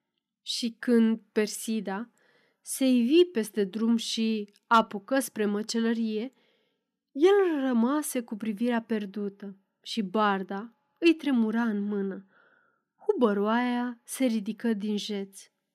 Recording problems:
none

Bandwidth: 14.5 kHz